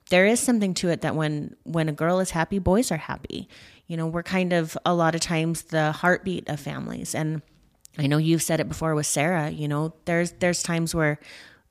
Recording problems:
none

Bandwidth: 15 kHz